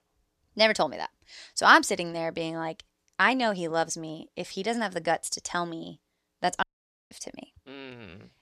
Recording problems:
audio cutting out; at 6.5 s

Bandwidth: 14 kHz